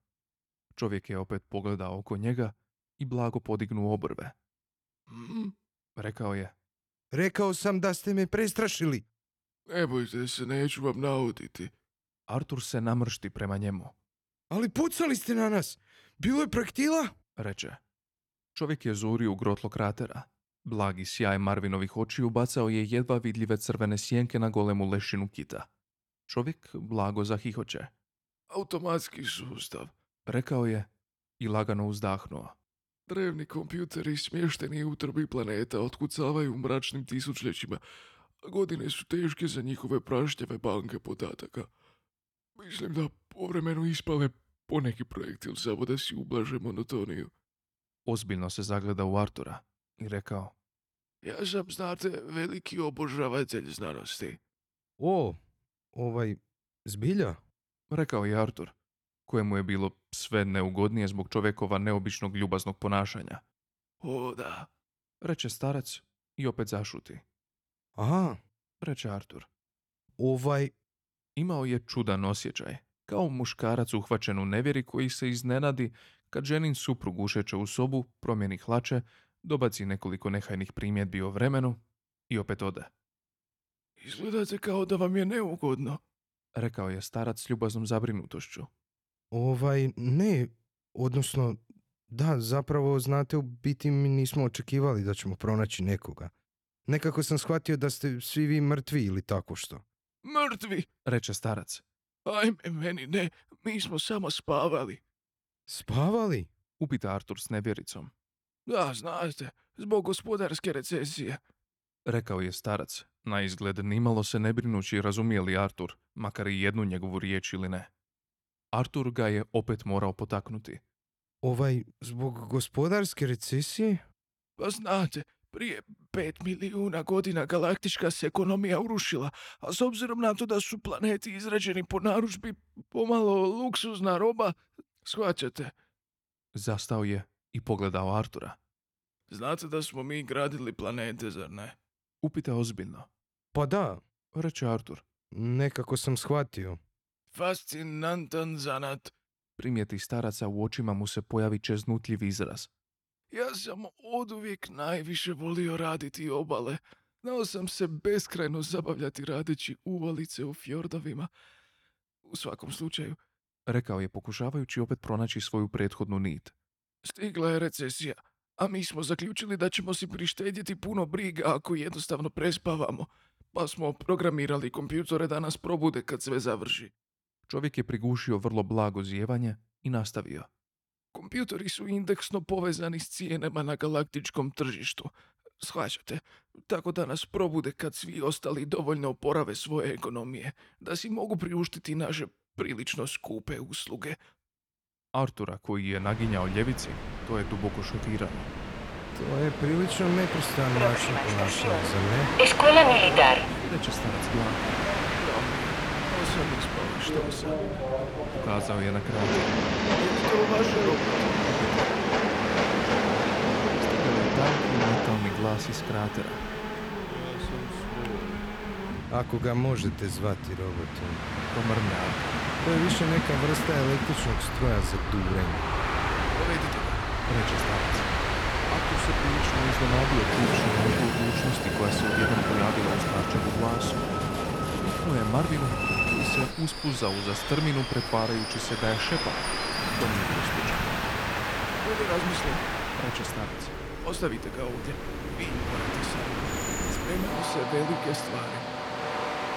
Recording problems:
train or aircraft noise; very loud; from 3:16 on; 4 dB above the speech

